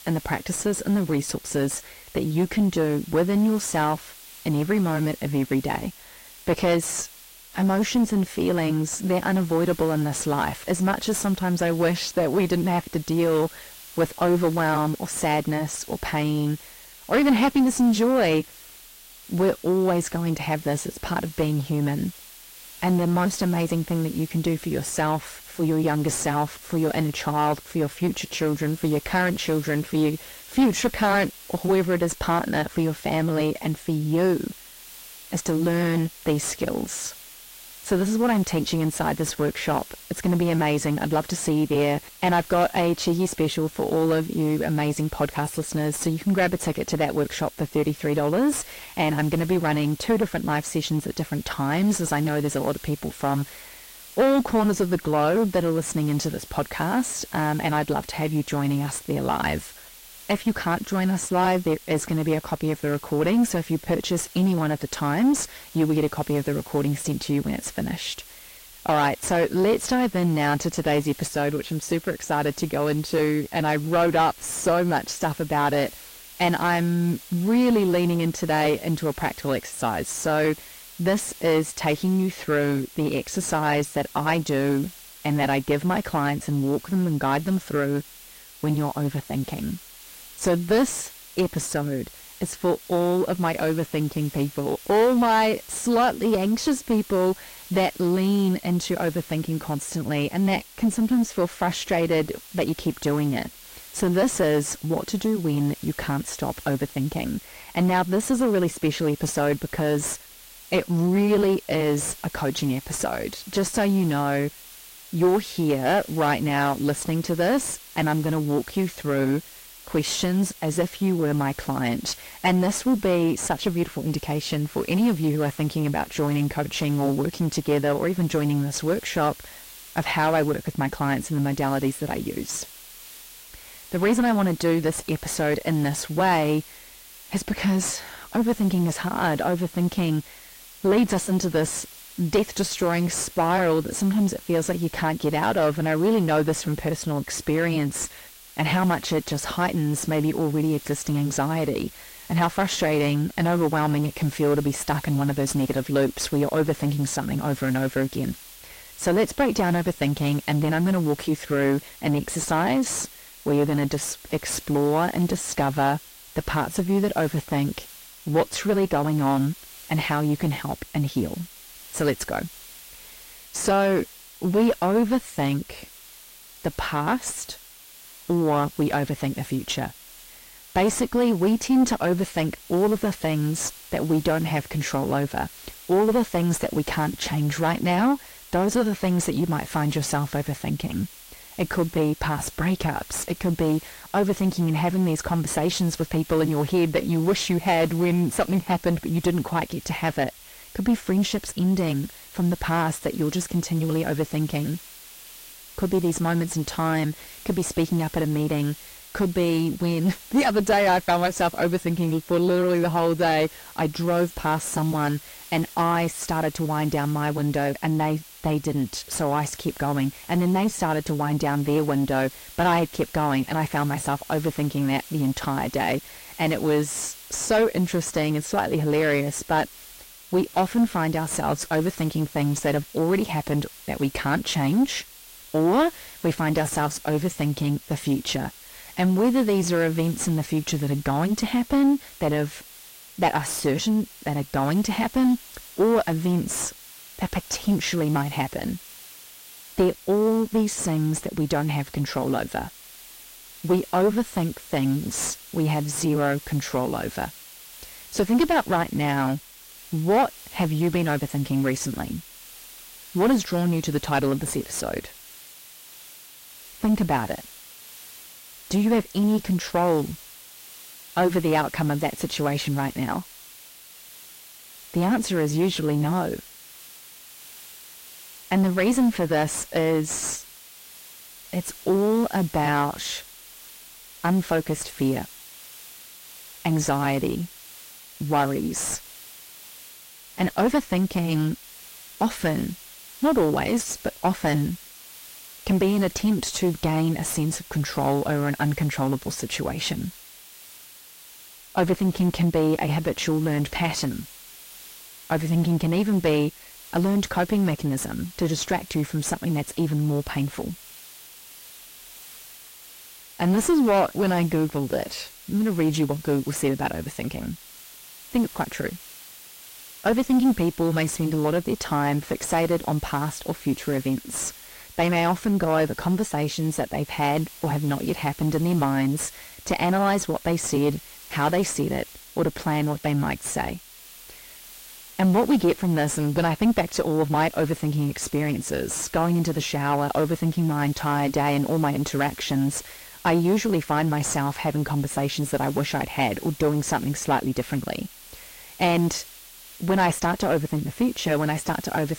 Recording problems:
distortion; slight; 10 dB below the speech
garbled, watery; slightly; nothing above 15 kHz
hiss; noticeable; throughout; 20 dB below the speech

